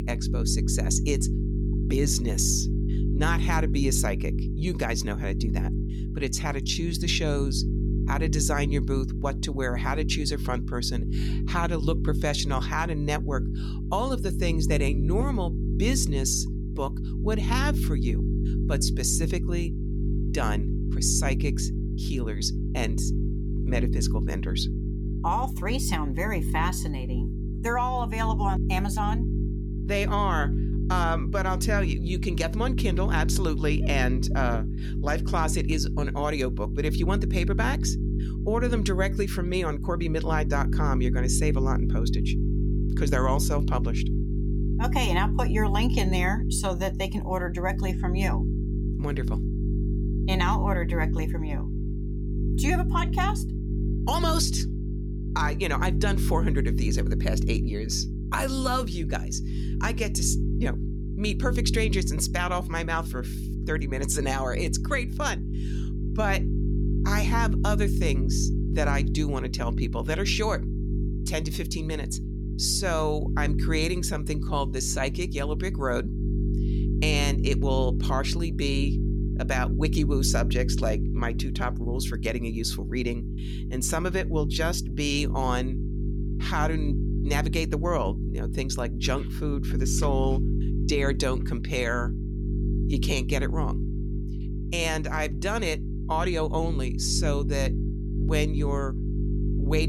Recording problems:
electrical hum; loud; throughout; 50 Hz, 9 dB below the speech
abrupt cut into speech; at the end

